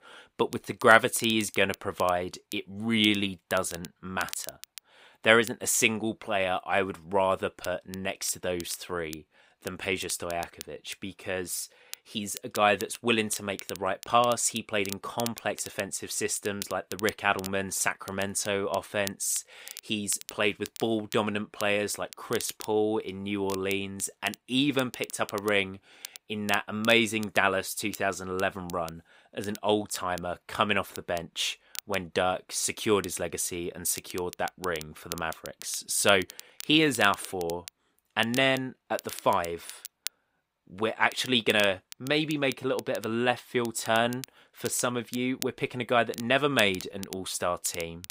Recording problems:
crackle, like an old record; noticeable; 15 dB below the speech

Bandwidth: 15.5 kHz